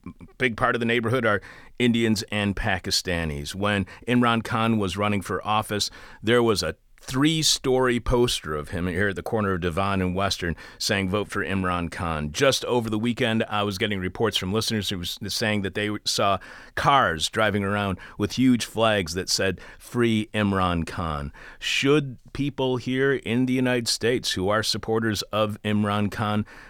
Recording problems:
none

